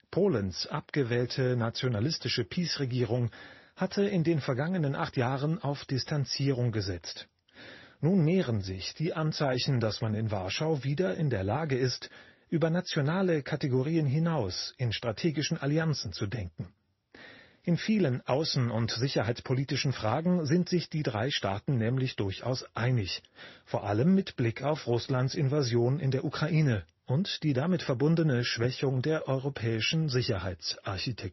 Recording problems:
garbled, watery; slightly; nothing above 5.5 kHz
high frequencies cut off; slight

